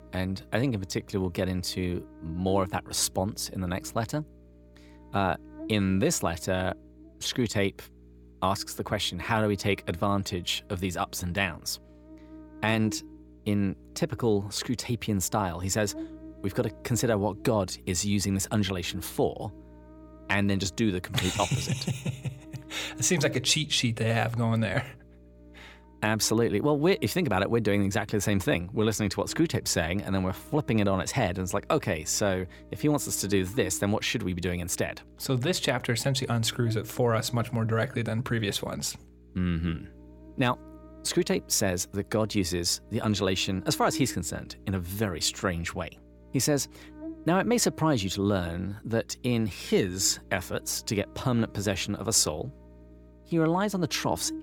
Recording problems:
electrical hum; faint; throughout; 60 Hz, 20 dB below the speech

